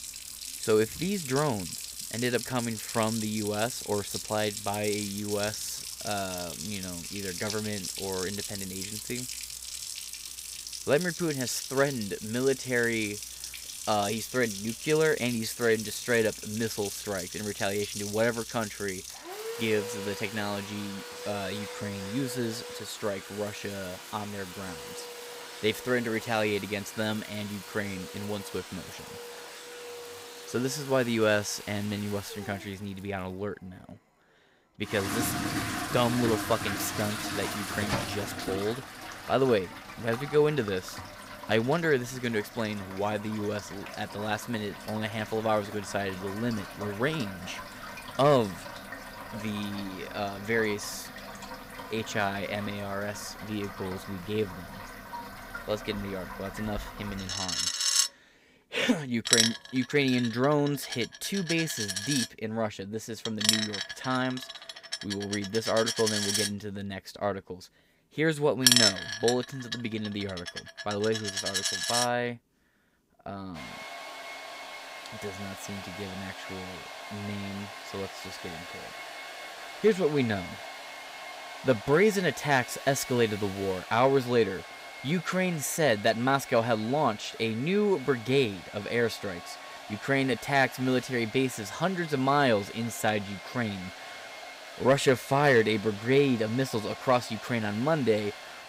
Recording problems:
household noises; loud; throughout; 6 dB below the speech

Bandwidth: 15.5 kHz